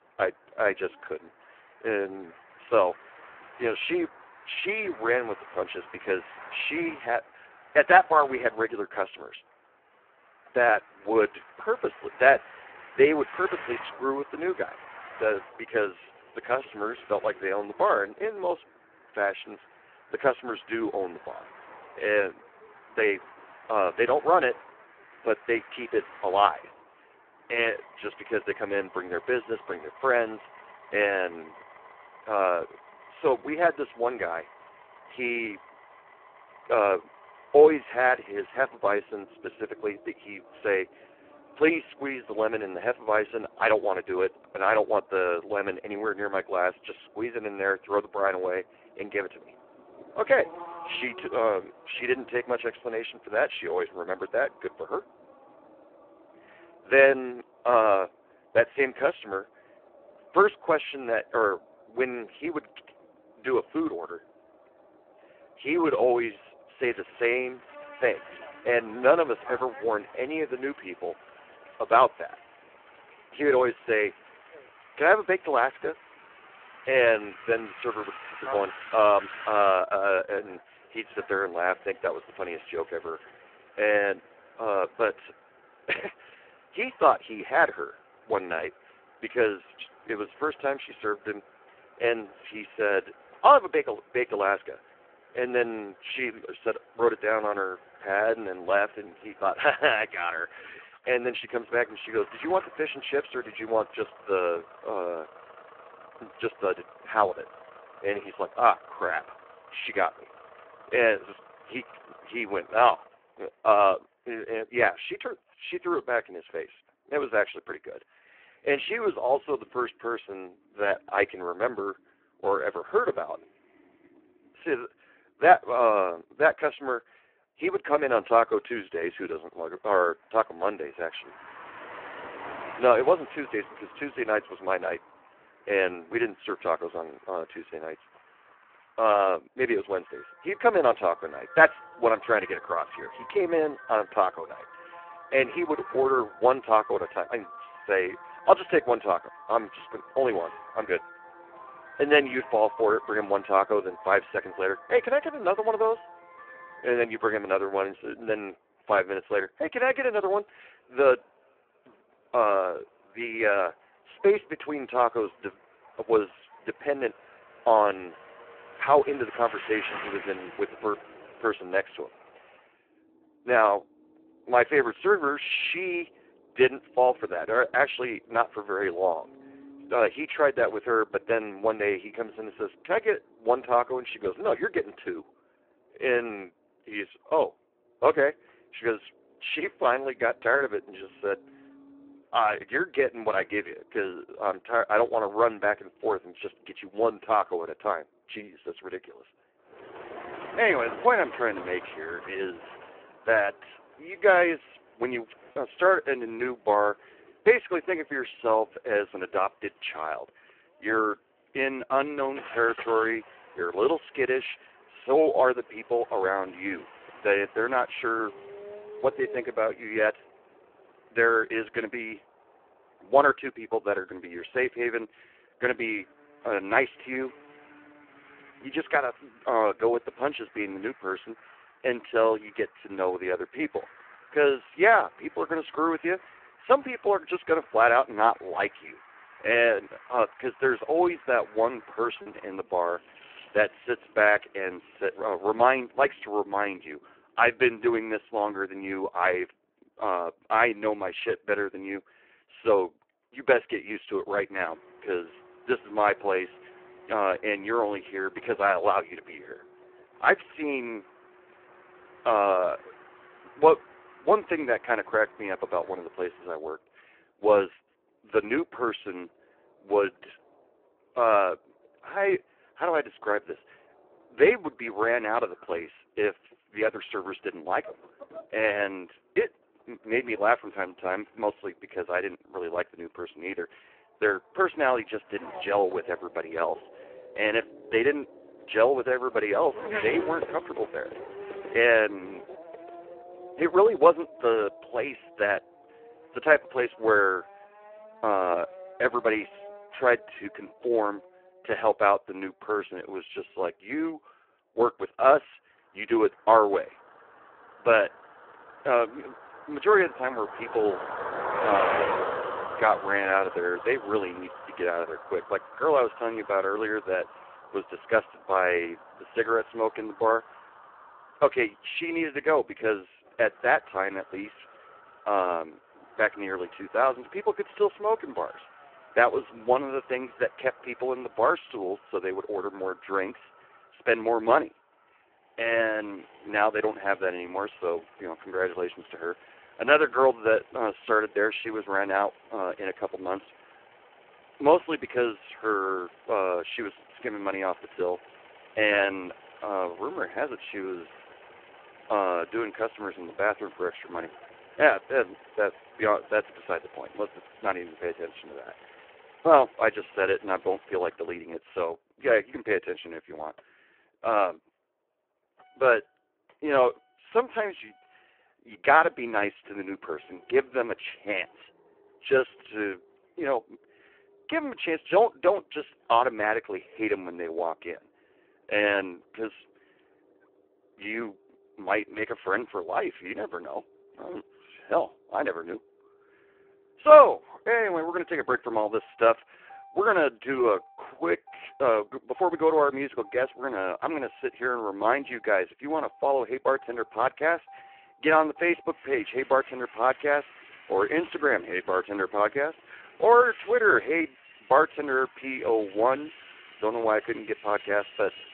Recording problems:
phone-call audio; poor line
traffic noise; noticeable; throughout; 20 dB below the speech
choppy; occasionally; at 3:26 and at 4:02; 1% of the speech affected

